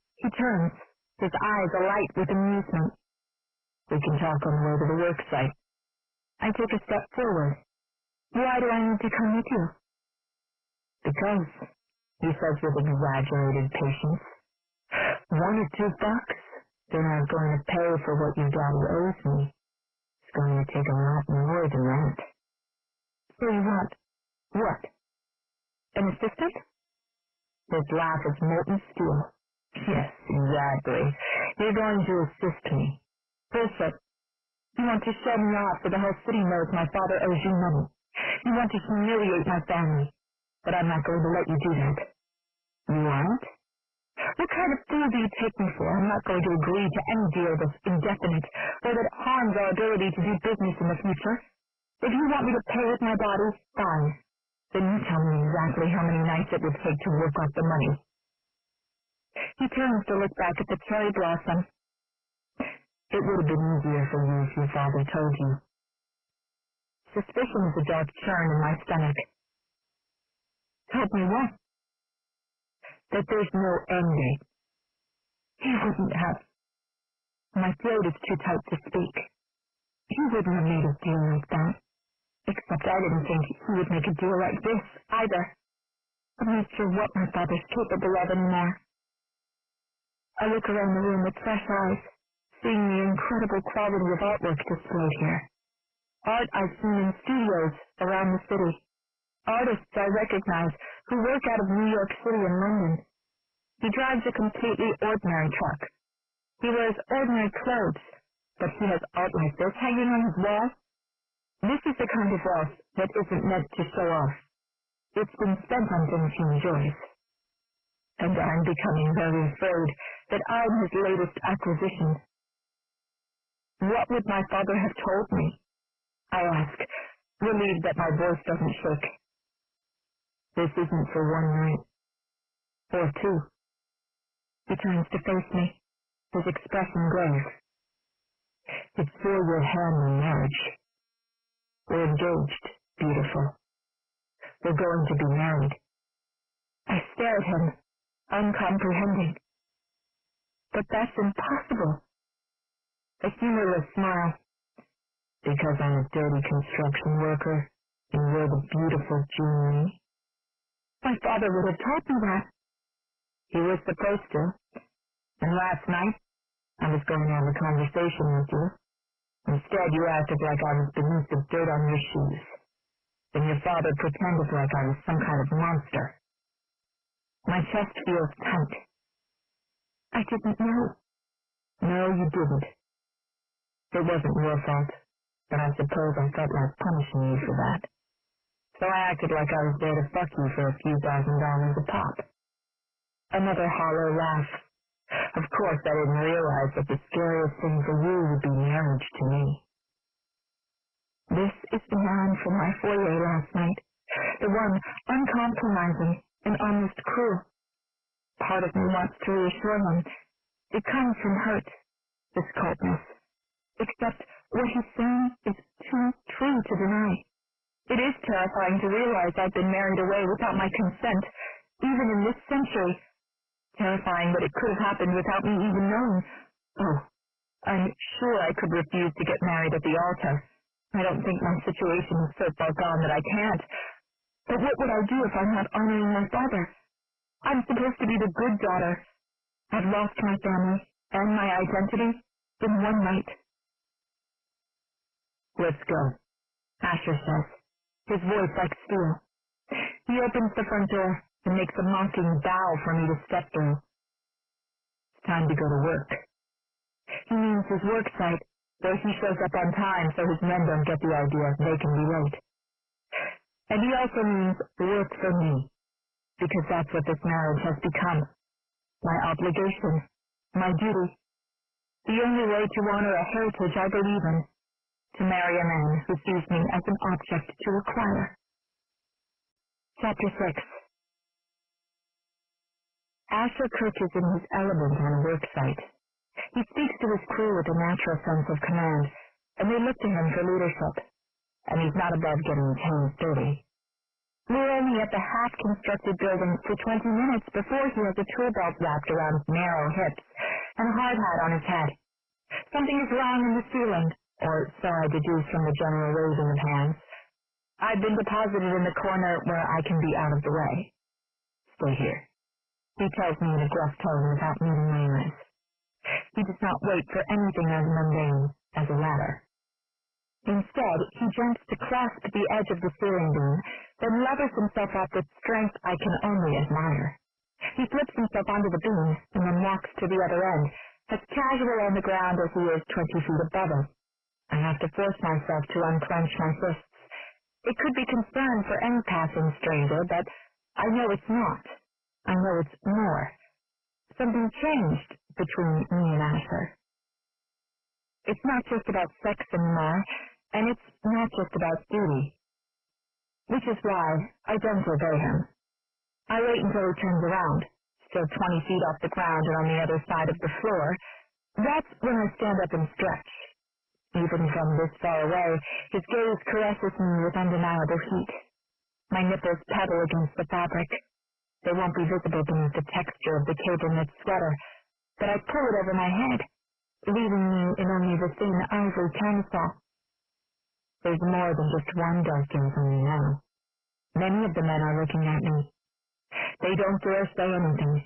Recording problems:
distortion; heavy; 25% of the sound clipped
garbled, watery; badly; nothing above 3 kHz

